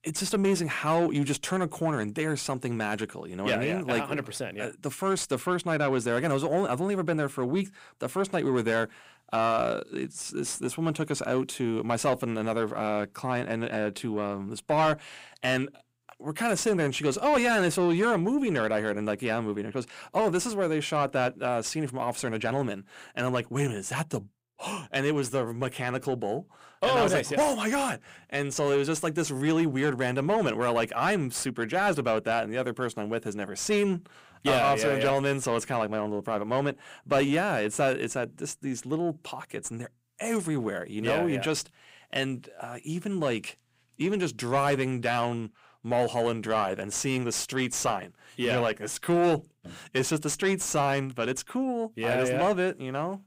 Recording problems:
distortion; slight; 10 dB below the speech

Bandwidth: 15.5 kHz